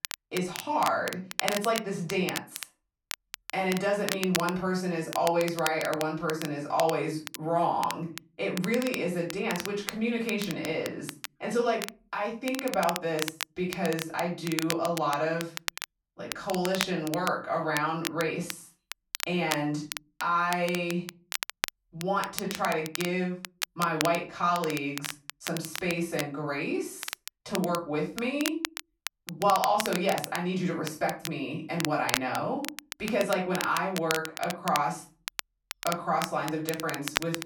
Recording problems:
off-mic speech; far
room echo; slight; dies away in 0.3 s
crackle, like an old record; loud; 7 dB below the speech

